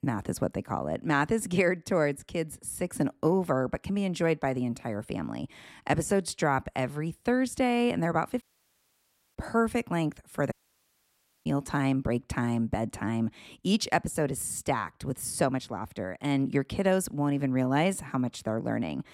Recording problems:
audio cutting out; at 8.5 s for 1 s and at 11 s for 1 s

